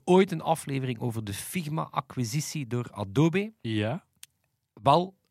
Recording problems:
none

